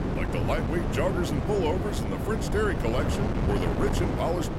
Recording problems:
wind noise on the microphone; heavy; 2 dB below the speech

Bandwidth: 16 kHz